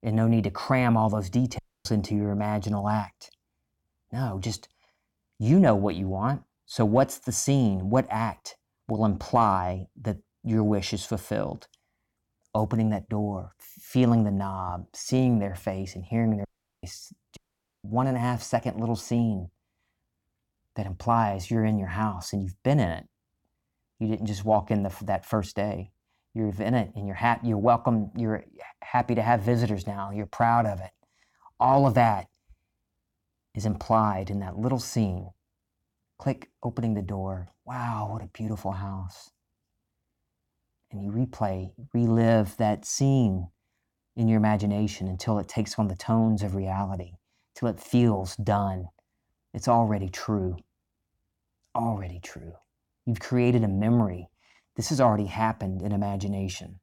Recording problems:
audio cutting out; at 1.5 s, at 16 s and at 17 s

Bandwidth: 17 kHz